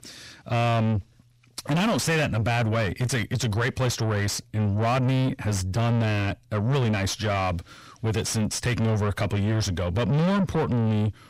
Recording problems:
distortion; heavy; 6 dB below the speech

